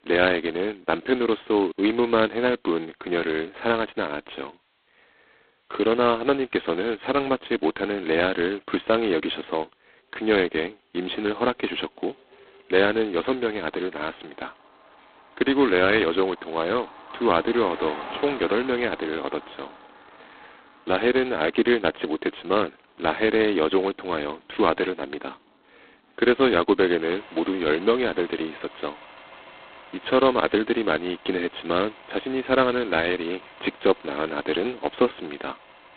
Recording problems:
phone-call audio; poor line; nothing above 4 kHz
traffic noise; faint; throughout; 20 dB below the speech

